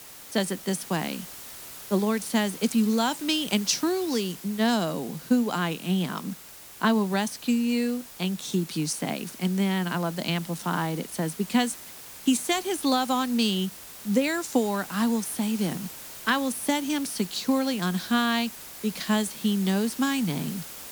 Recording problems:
hiss; noticeable; throughout; 15 dB below the speech

